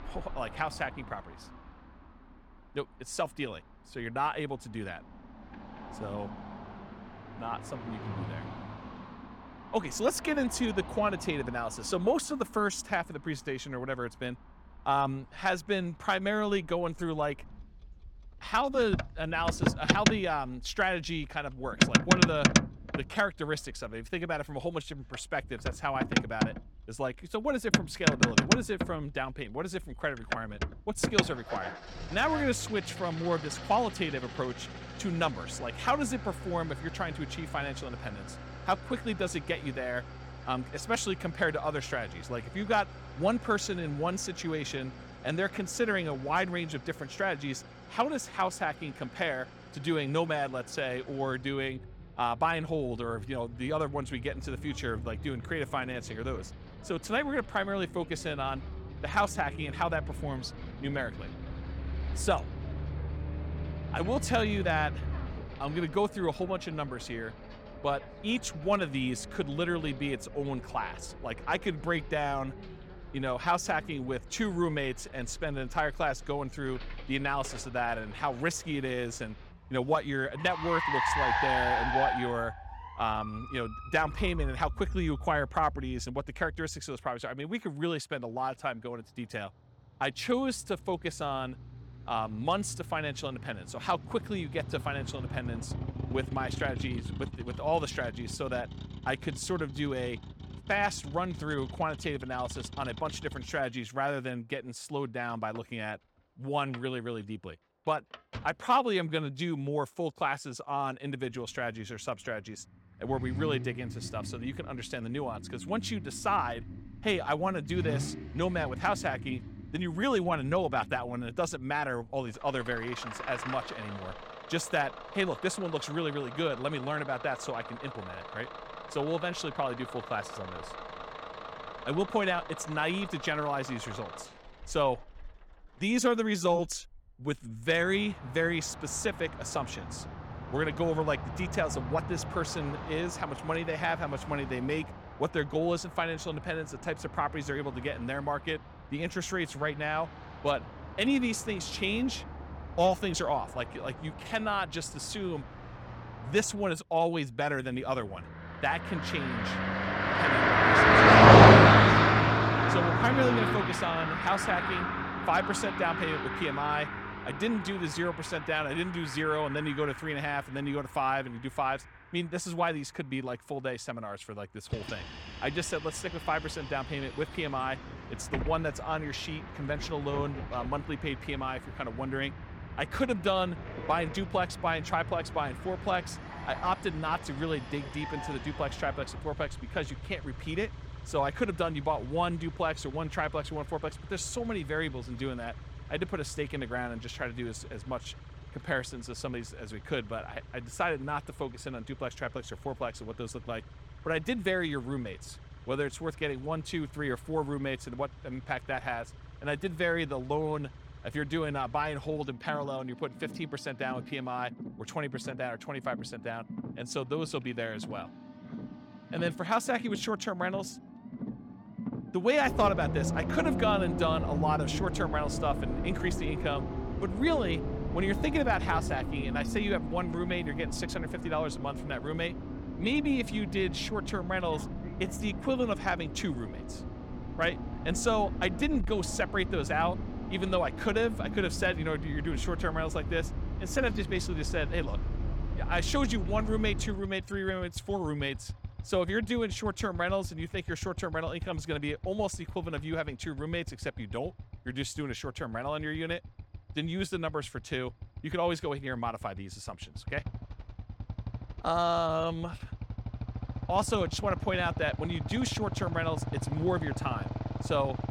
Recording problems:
traffic noise; very loud; throughout; 1 dB above the speech

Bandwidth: 18 kHz